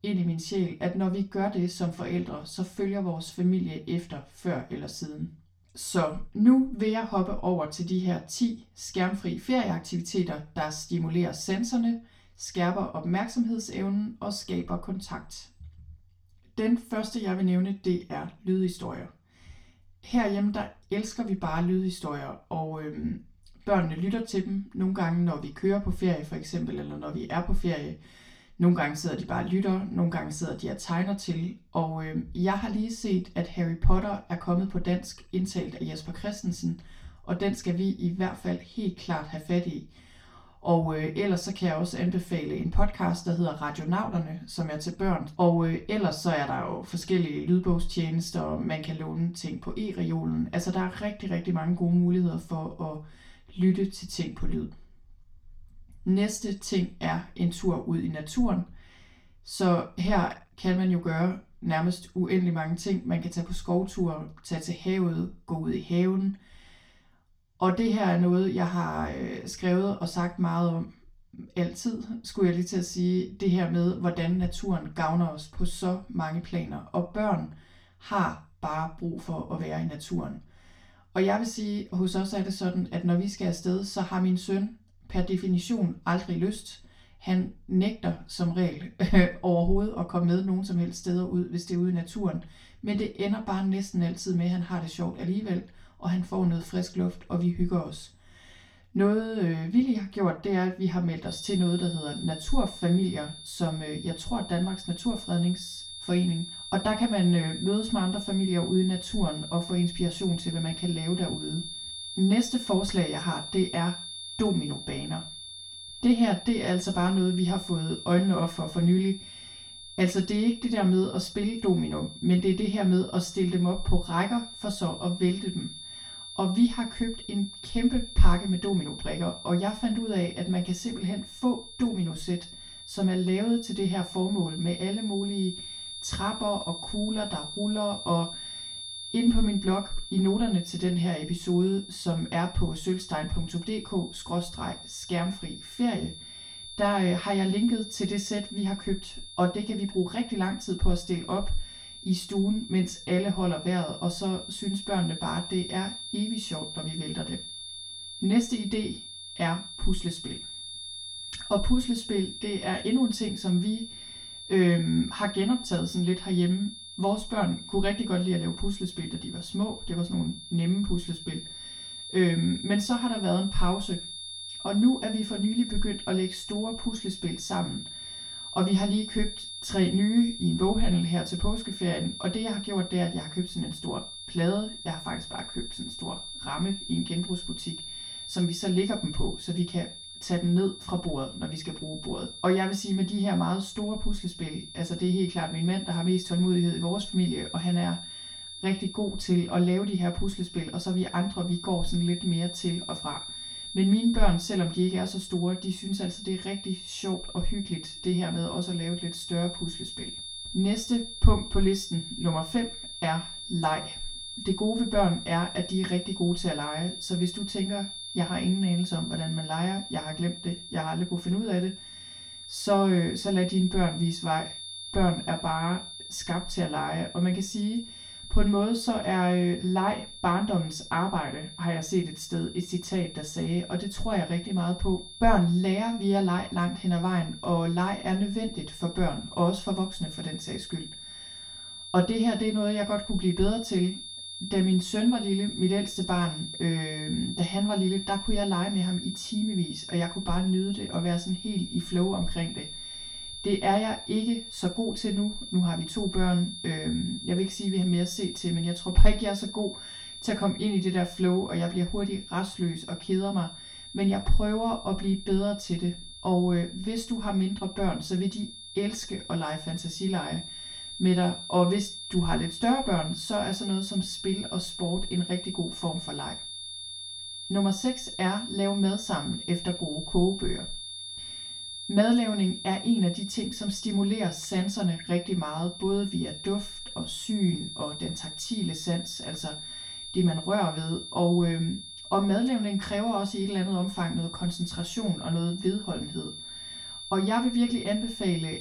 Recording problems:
off-mic speech; far
room echo; very slight; dies away in 0.3 s
high-pitched whine; loud; from 1:41 on; 3.5 kHz, 10 dB below the speech

